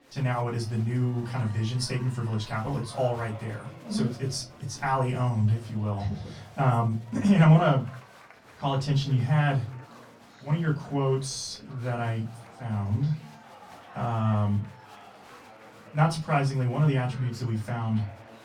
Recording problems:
off-mic speech; far
room echo; very slight; dies away in 0.3 s
chatter from many people; faint; throughout; 20 dB below the speech

